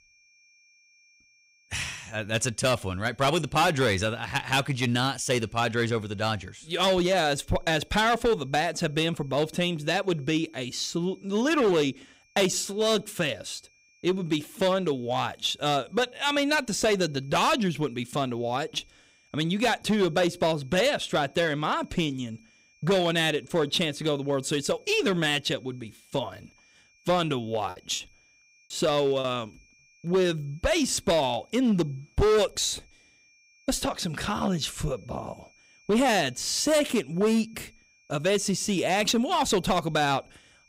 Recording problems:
distortion; slight; 5% of the sound clipped
high-pitched whine; faint; throughout; 2.5 kHz, 35 dB below the speech
choppy; very; from 28 to 29 s; 8% of the speech affected

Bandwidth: 15.5 kHz